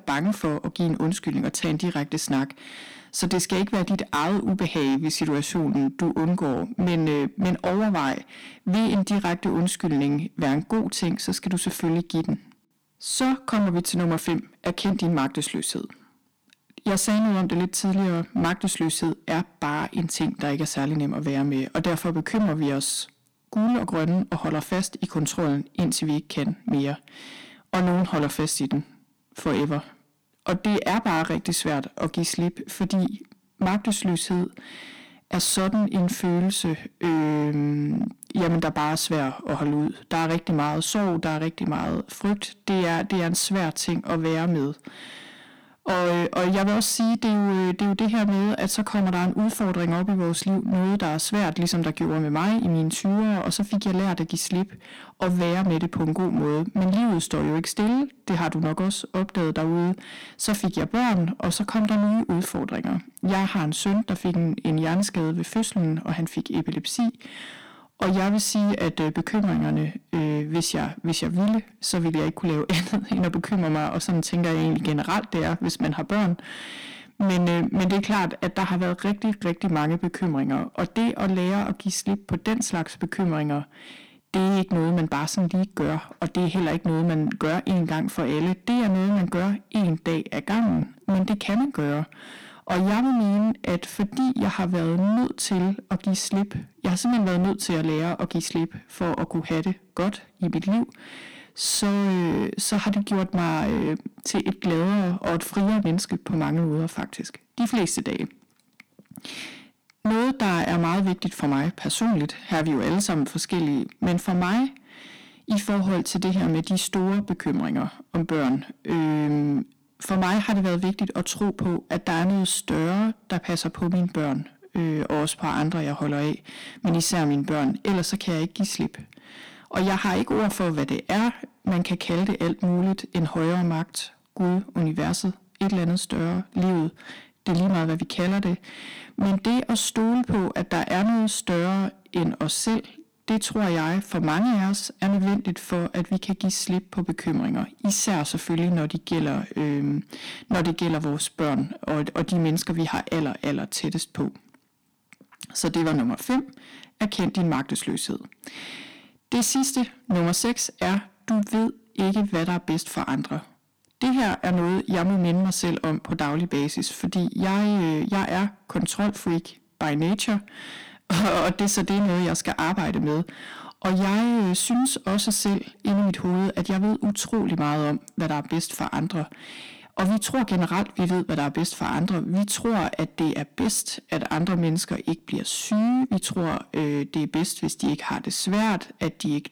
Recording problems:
distortion; heavy; 19% of the sound clipped

